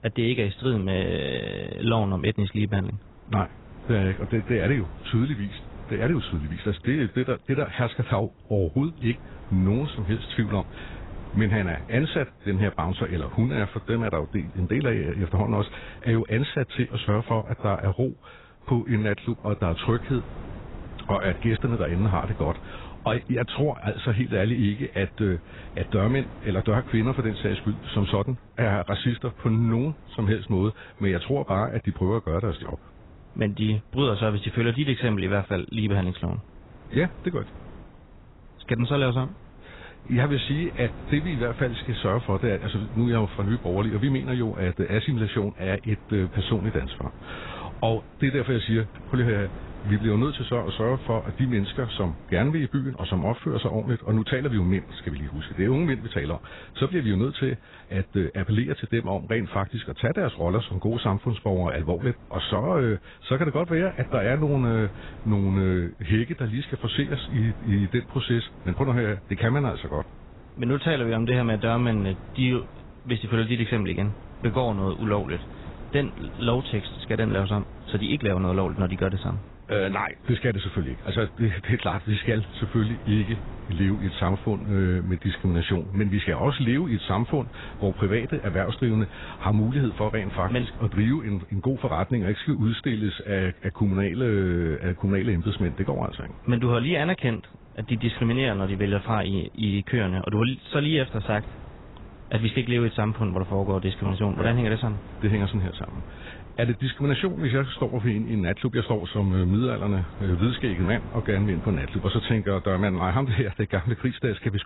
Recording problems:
garbled, watery; badly; nothing above 4 kHz
wind noise on the microphone; occasional gusts; 20 dB below the speech

